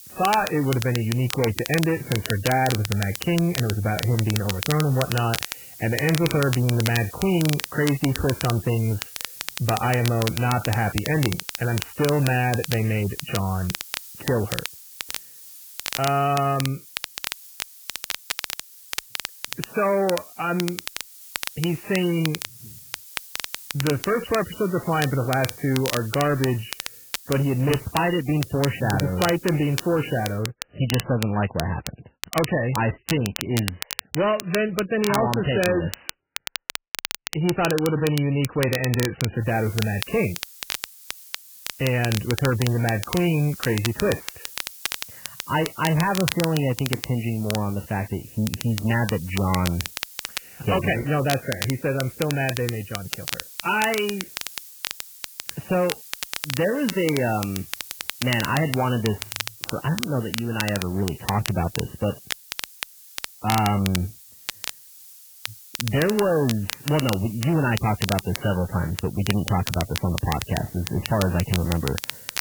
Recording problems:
garbled, watery; badly; nothing above 3 kHz
distortion; slight; 10 dB below the speech
crackle, like an old record; loud; 8 dB below the speech
hiss; noticeable; until 30 s and from 39 s on; 15 dB below the speech

